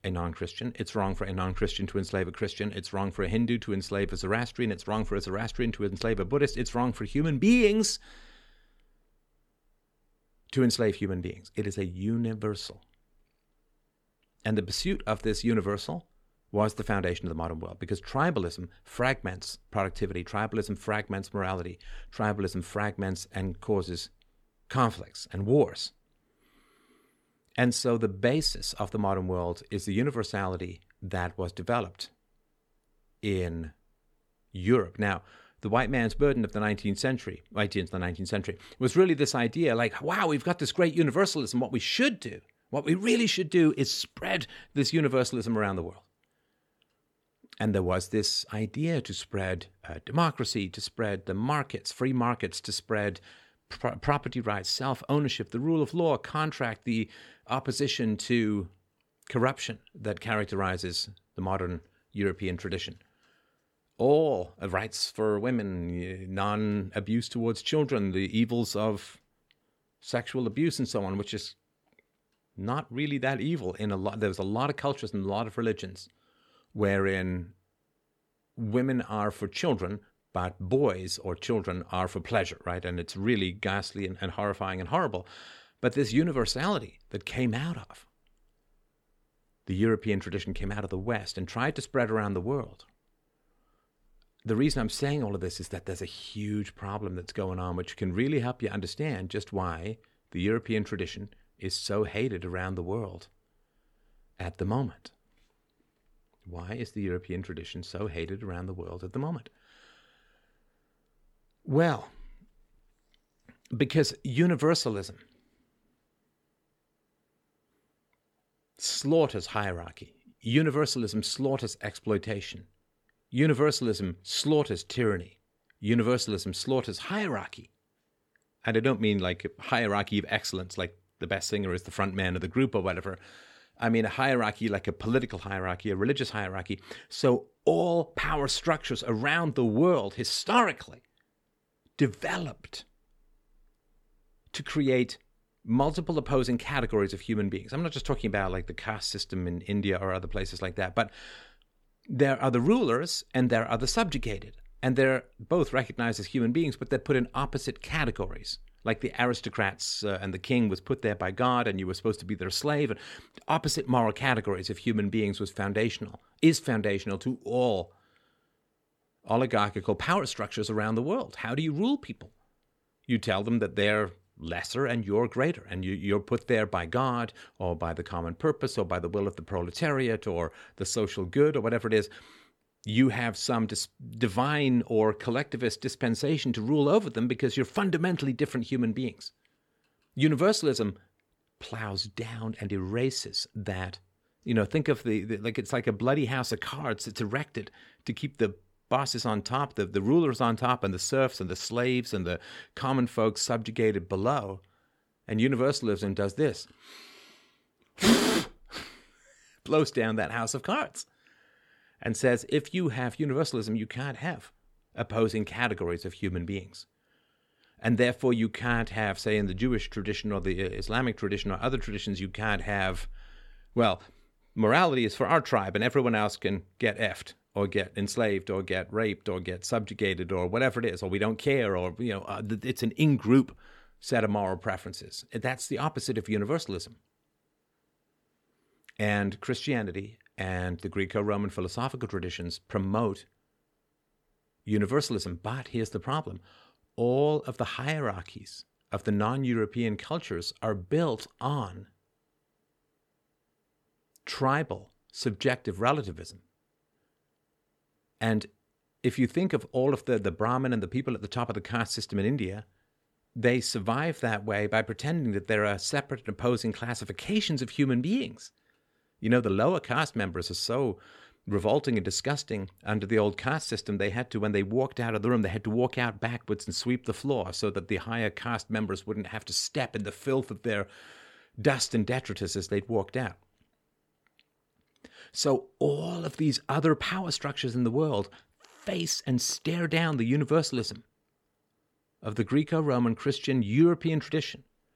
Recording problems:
none

